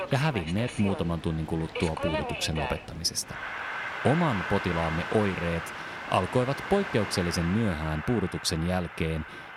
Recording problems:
train or aircraft noise; loud; throughout; 6 dB below the speech

